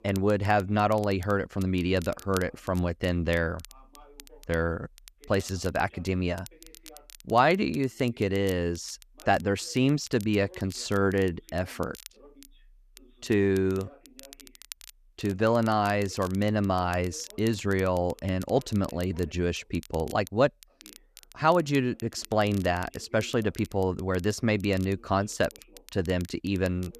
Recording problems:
voice in the background; faint; throughout; 30 dB below the speech
crackle, like an old record; faint; 20 dB below the speech

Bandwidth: 14.5 kHz